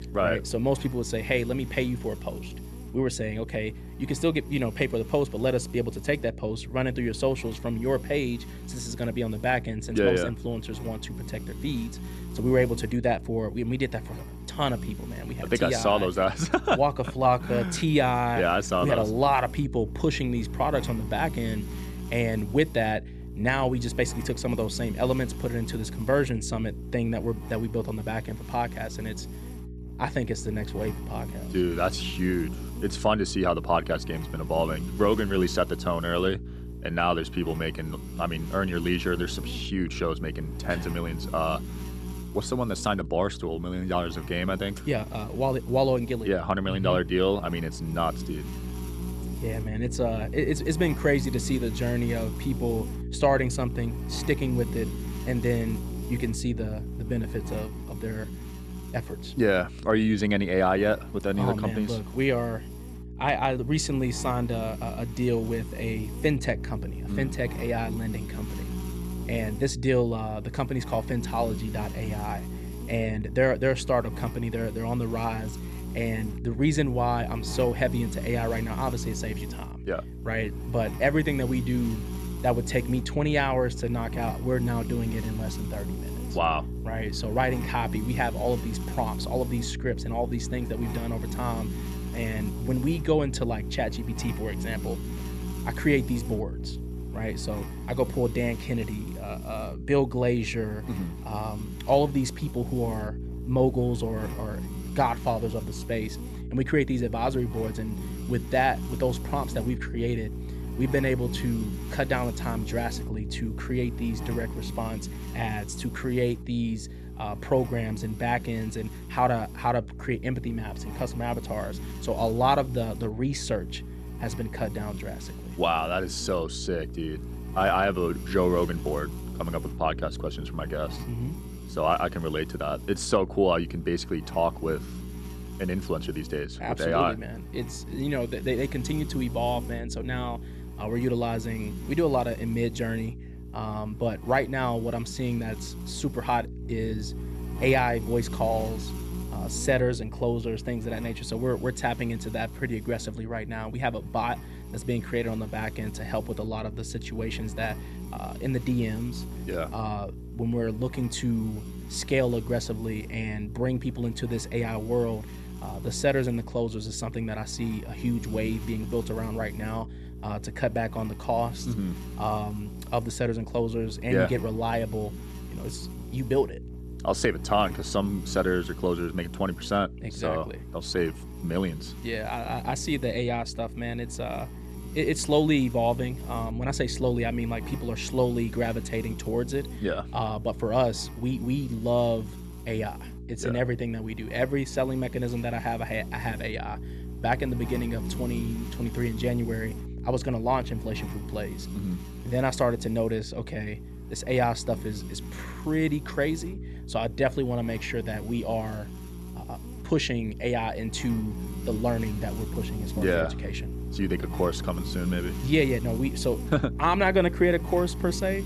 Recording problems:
electrical hum; noticeable; throughout; 60 Hz, 15 dB below the speech

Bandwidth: 14 kHz